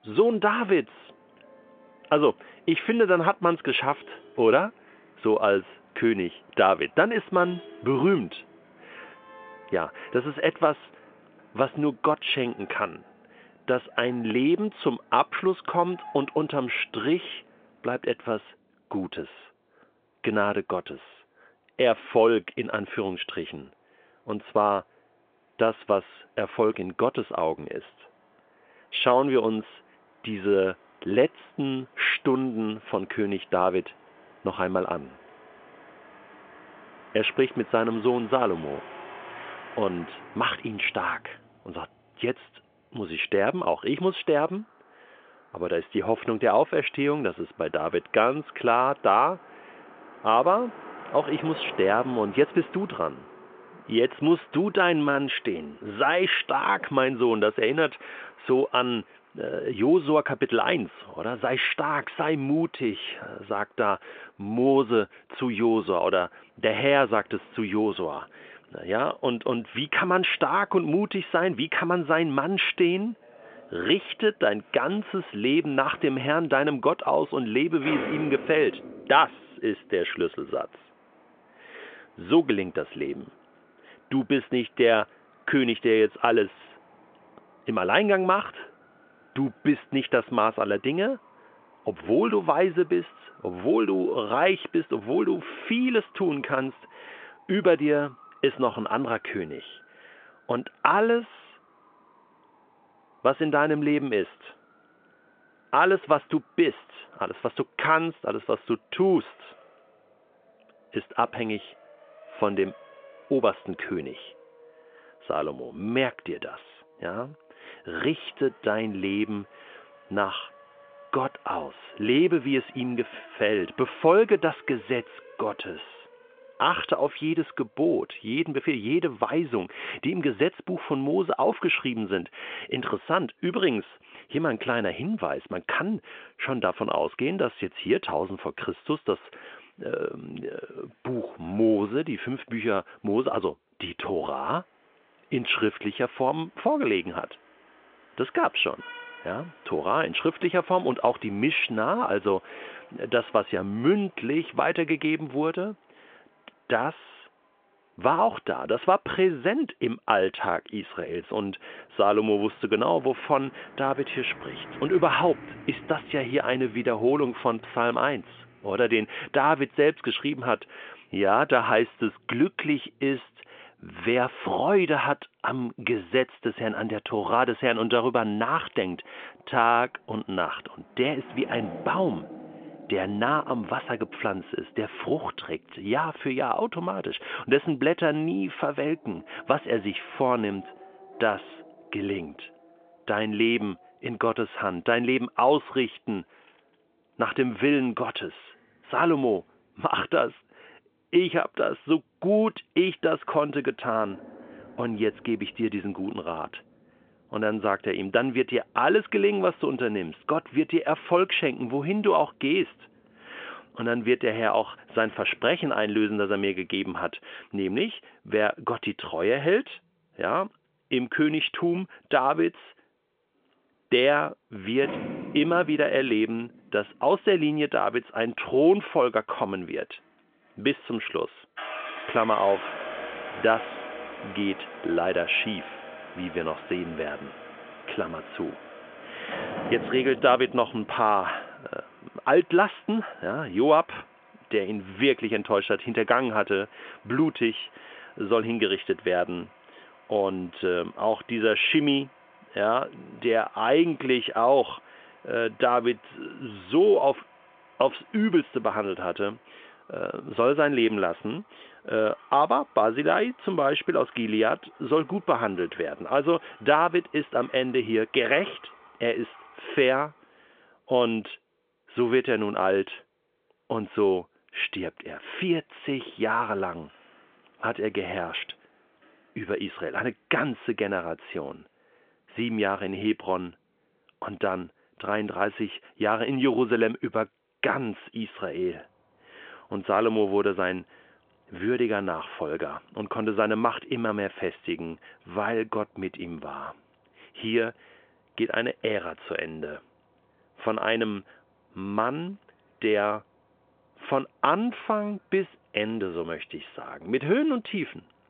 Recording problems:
phone-call audio; nothing above 3.5 kHz
traffic noise; faint; throughout; 20 dB below the speech

